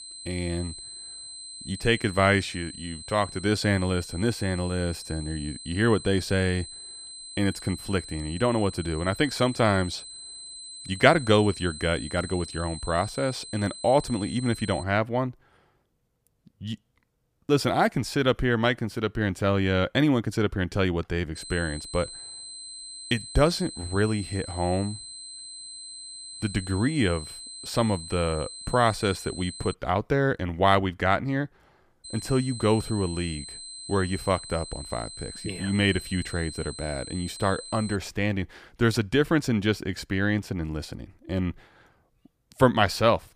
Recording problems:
high-pitched whine; noticeable; until 15 s, from 21 to 30 s and from 32 to 38 s; 4 kHz, 10 dB below the speech

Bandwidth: 15 kHz